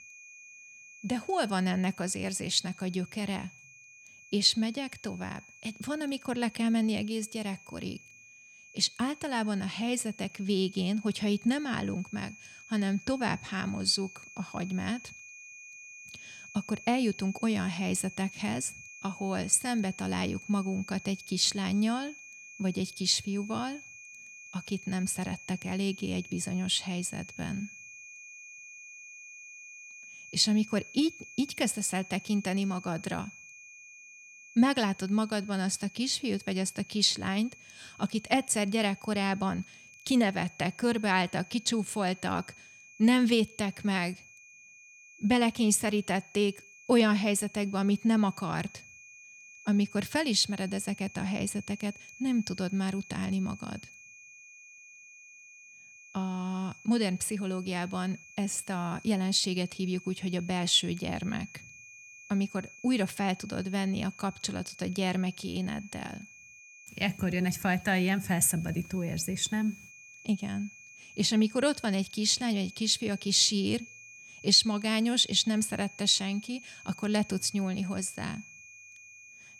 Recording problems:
high-pitched whine; noticeable; throughout; 2.5 kHz, 20 dB below the speech

